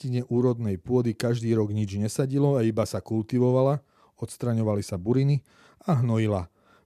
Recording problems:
none

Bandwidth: 14 kHz